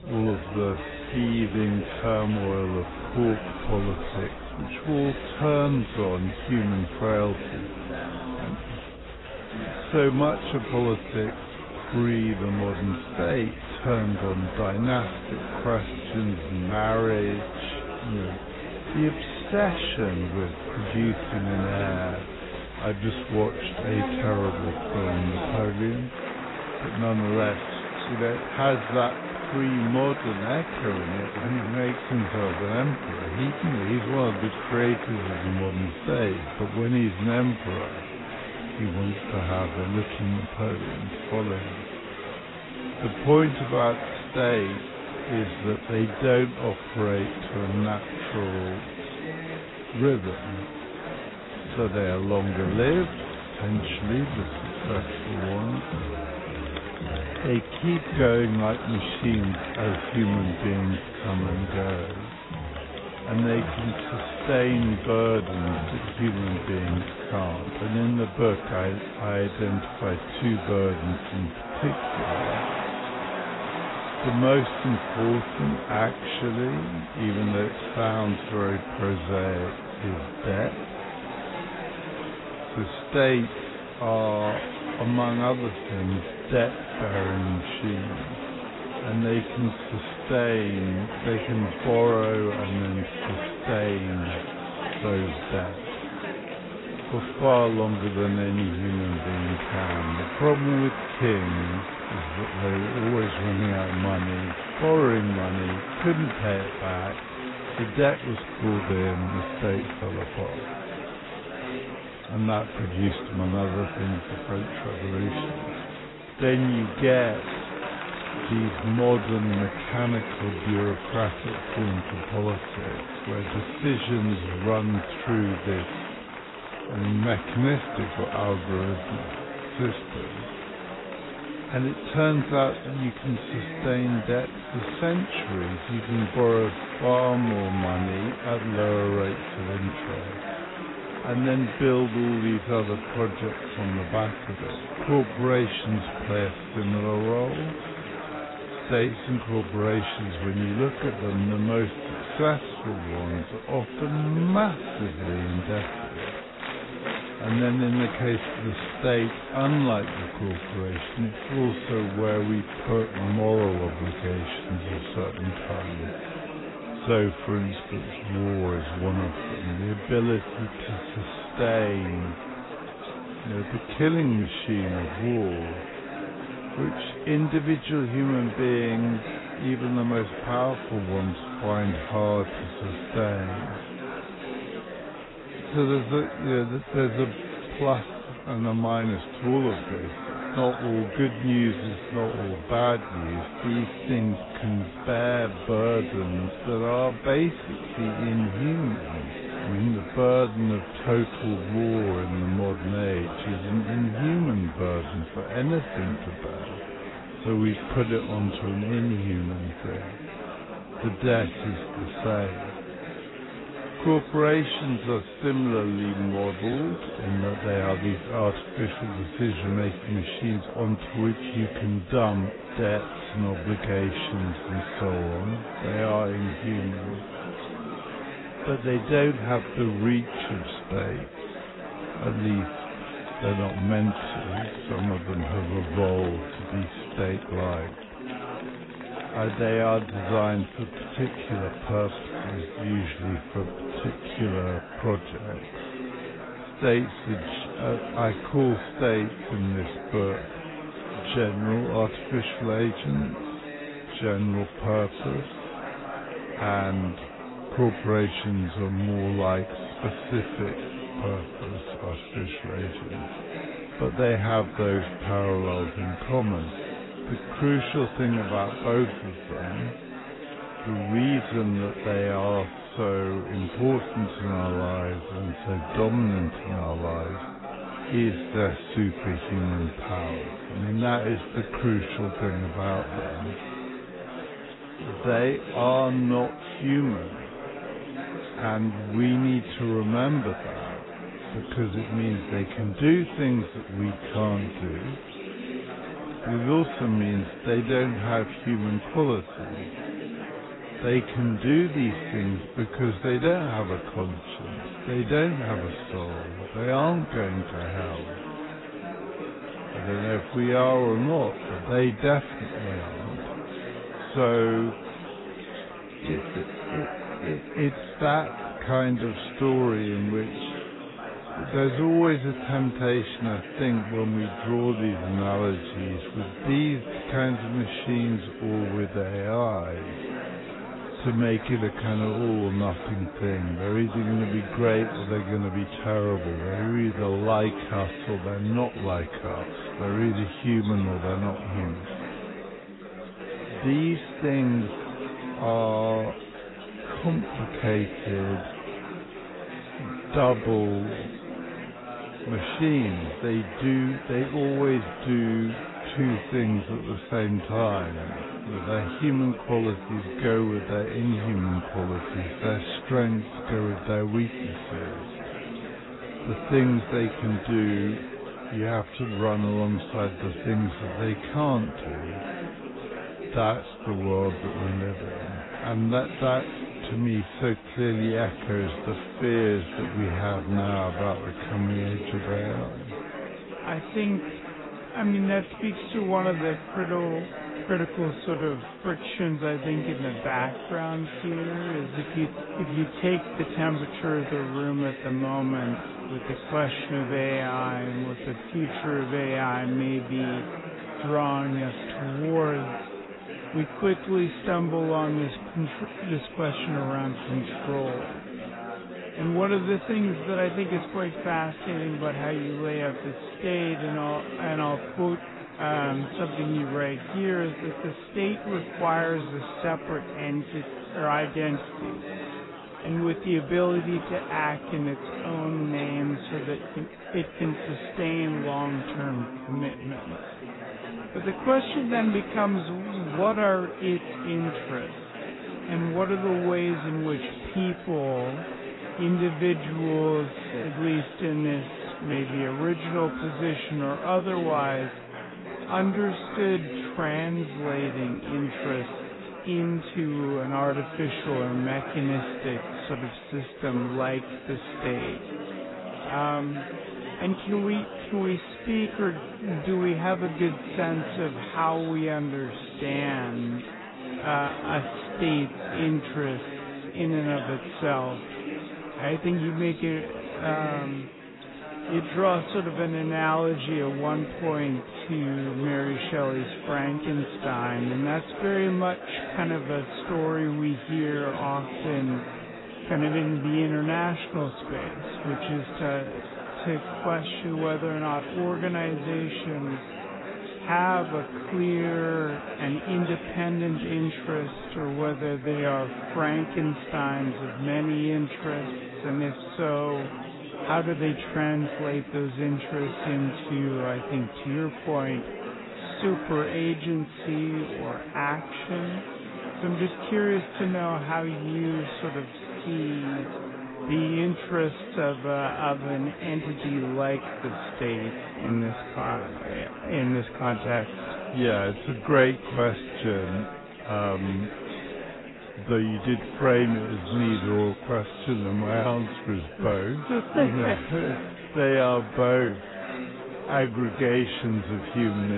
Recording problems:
garbled, watery; badly; nothing above 4 kHz
wrong speed, natural pitch; too slow; 0.6 times normal speed
chatter from many people; loud; throughout; 8 dB below the speech
abrupt cut into speech; at the end

